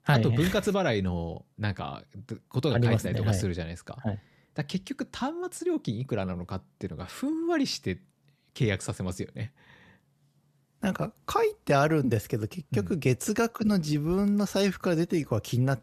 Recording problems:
none

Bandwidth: 14 kHz